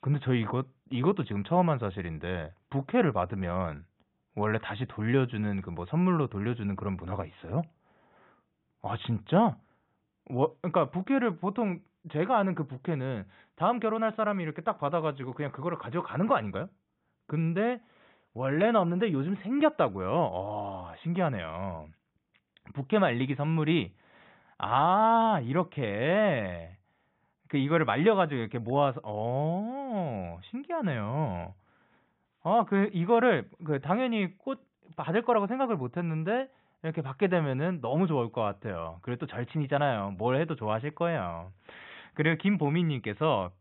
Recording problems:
high frequencies cut off; severe; nothing above 3.5 kHz

